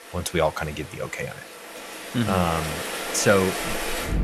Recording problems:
rain or running water; loud; throughout; 6 dB below the speech

